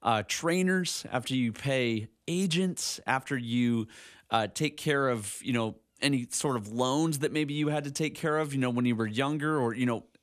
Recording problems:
none

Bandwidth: 14.5 kHz